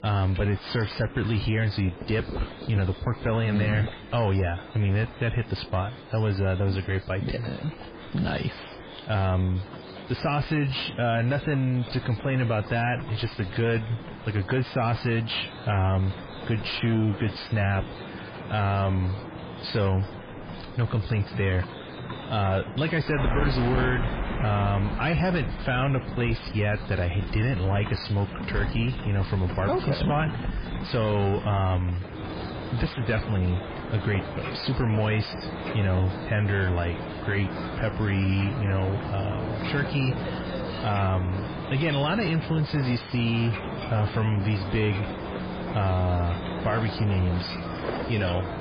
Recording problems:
garbled, watery; badly
distortion; slight; 9 dB below the speech
rain or running water; loud; throughout; 8 dB below the speech
animal sounds; noticeable; throughout; 15 dB below the speech
murmuring crowd; noticeable; throughout; 20 dB below the speech

